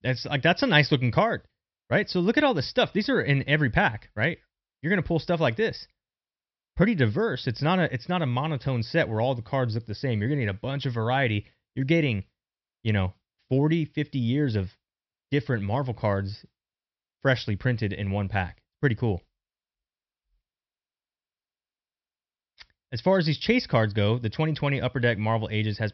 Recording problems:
high frequencies cut off; noticeable; nothing above 5.5 kHz

